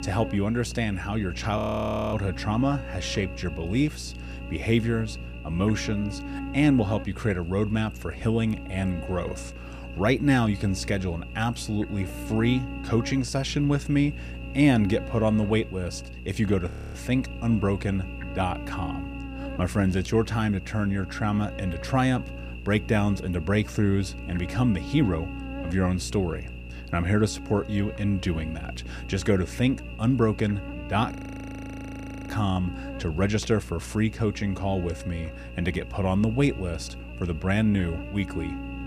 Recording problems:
electrical hum; noticeable; throughout; 60 Hz, 10 dB below the speech
audio freezing; at 1.5 s for 0.5 s, at 17 s and at 31 s for 1 s

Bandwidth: 14.5 kHz